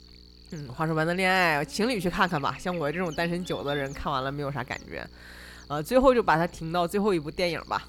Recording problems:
electrical hum; faint; throughout; 60 Hz, 20 dB below the speech

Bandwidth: 17 kHz